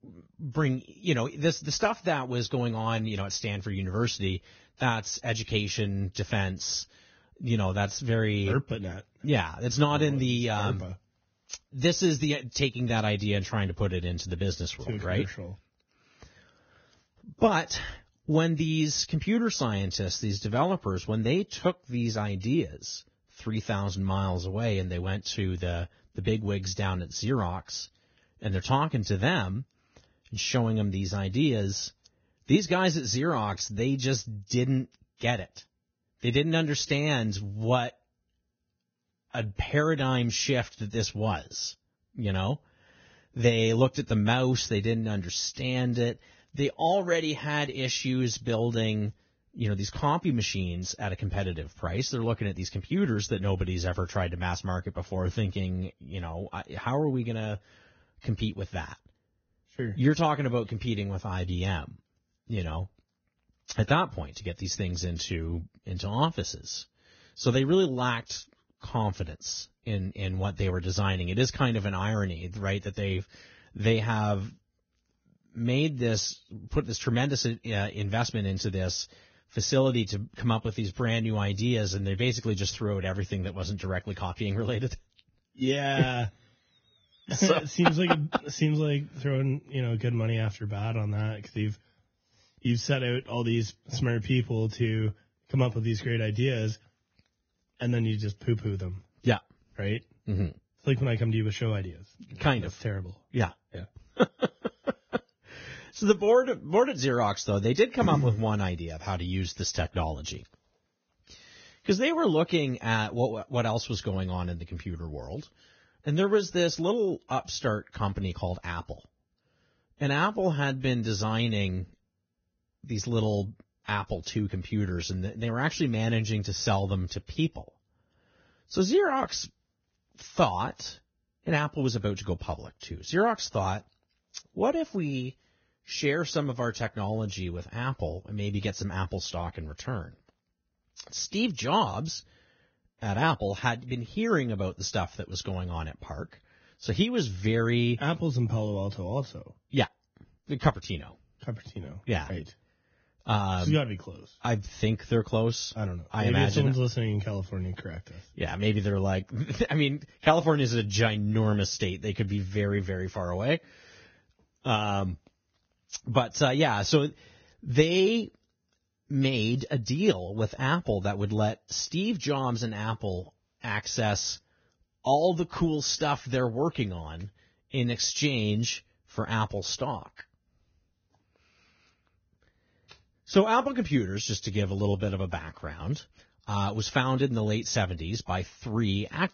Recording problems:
garbled, watery; badly; nothing above 6.5 kHz

